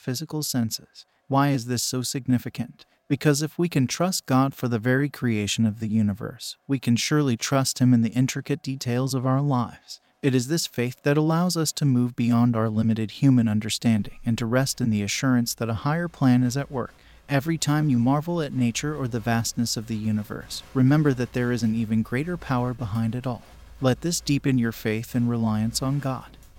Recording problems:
crowd noise; faint; throughout; 25 dB below the speech

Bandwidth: 16.5 kHz